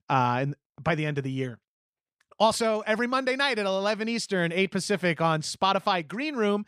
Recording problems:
none

